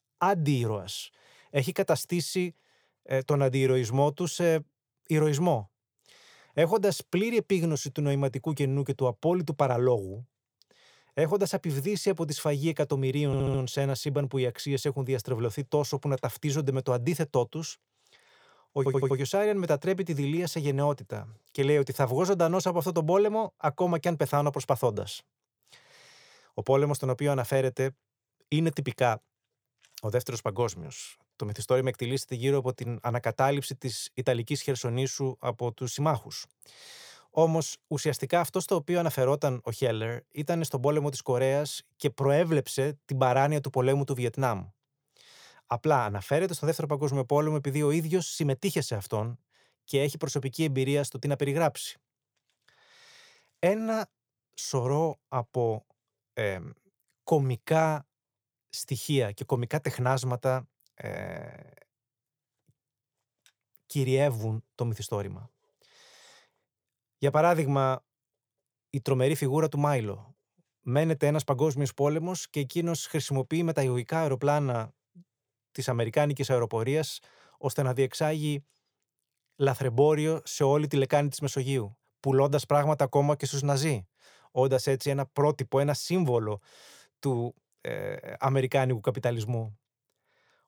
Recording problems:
audio stuttering; at 13 s and at 19 s

